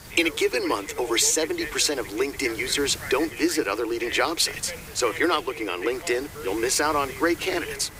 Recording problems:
thin; very; fading below 300 Hz
voice in the background; noticeable; throughout; 15 dB below the speech
hiss; noticeable; throughout; 15 dB below the speech
train or aircraft noise; faint; throughout; 25 dB below the speech

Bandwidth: 15.5 kHz